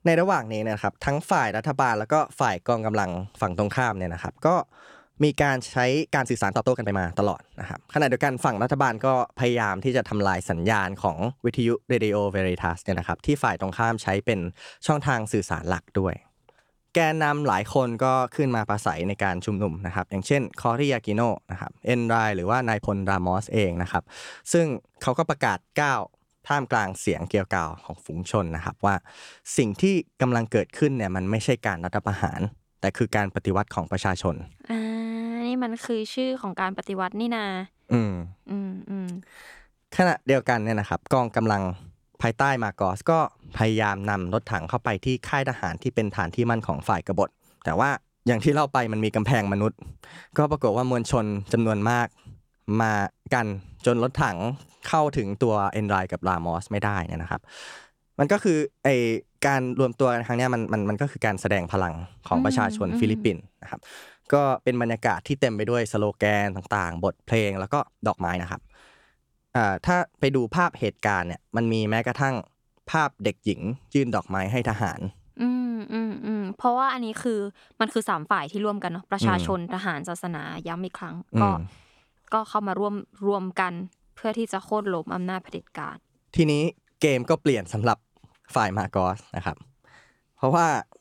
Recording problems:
uneven, jittery; strongly; from 6 s to 1:26

